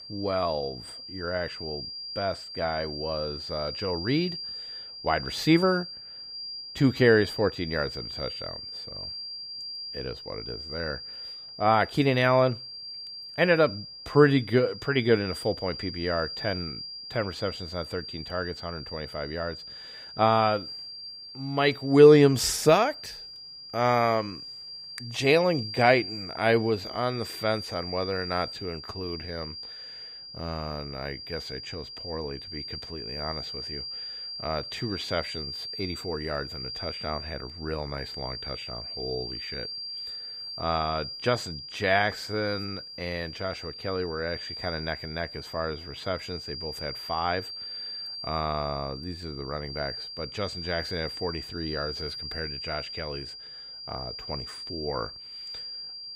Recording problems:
high-pitched whine; loud; throughout; 5 kHz, 9 dB below the speech

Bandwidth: 15.5 kHz